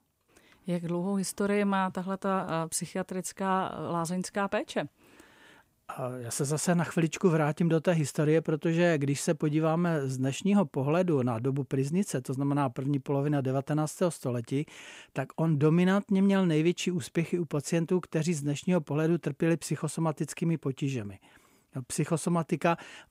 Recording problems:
none

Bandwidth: 15.5 kHz